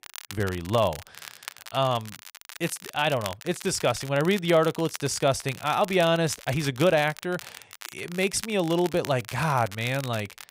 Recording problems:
crackle, like an old record; noticeable; 15 dB below the speech

